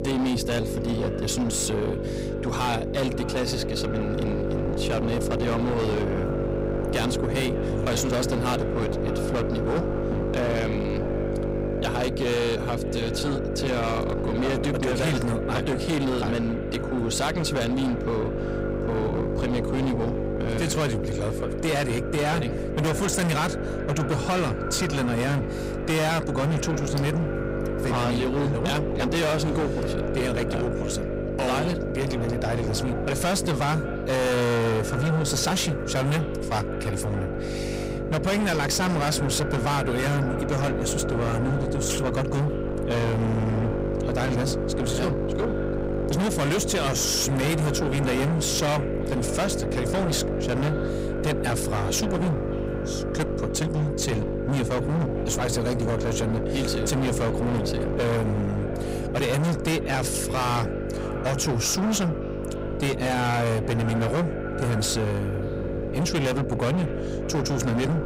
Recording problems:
distortion; heavy; 27% of the sound clipped
echo of what is said; noticeable; throughout; 600 ms later, 15 dB below the speech
electrical hum; loud; throughout; 50 Hz, 4 dB below the speech
wind noise on the microphone; occasional gusts; 20 dB below the speech

